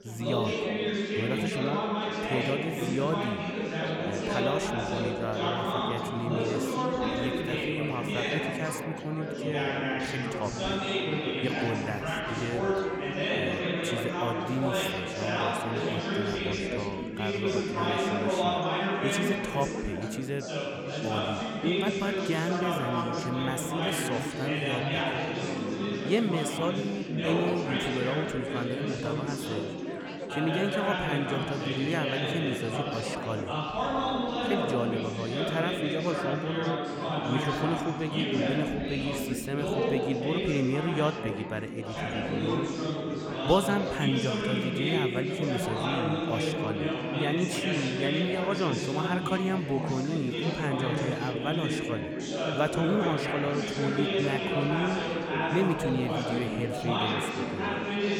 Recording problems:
chatter from many people; very loud; throughout; 2 dB above the speech

